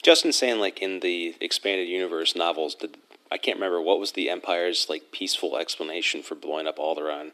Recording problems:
thin; very slightly; fading below 300 Hz

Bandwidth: 14 kHz